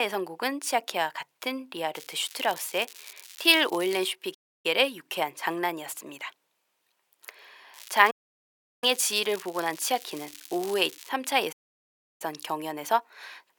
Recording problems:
thin; very; fading below 700 Hz
crackling; noticeable; from 2 to 4 s and from 7.5 to 11 s; 20 dB below the speech
abrupt cut into speech; at the start
audio cutting out; at 4.5 s, at 8 s for 0.5 s and at 12 s for 0.5 s

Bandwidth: 18.5 kHz